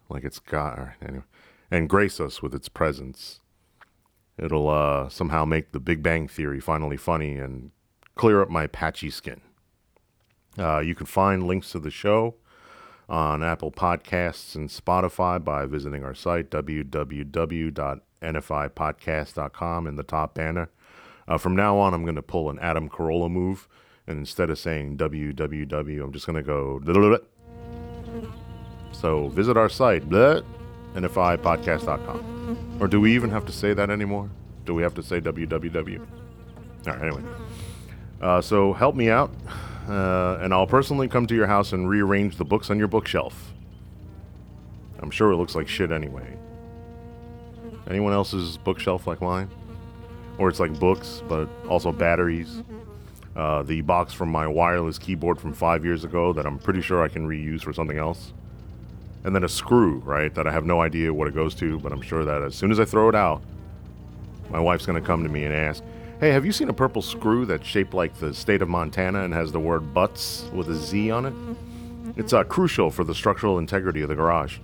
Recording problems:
electrical hum; faint; from 28 s on; 60 Hz, 20 dB below the speech

